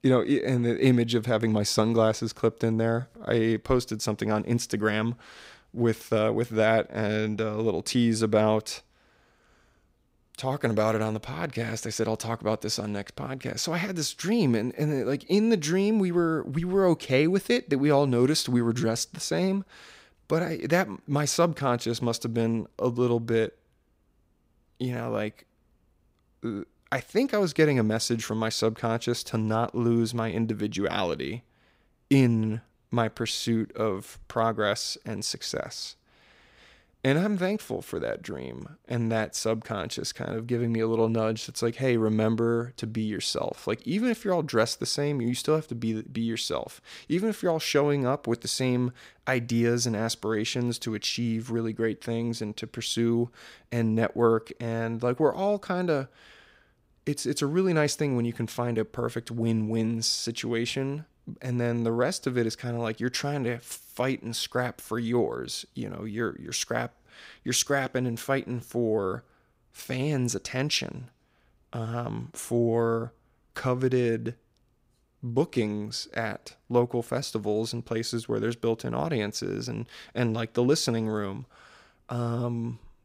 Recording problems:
none

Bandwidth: 15.5 kHz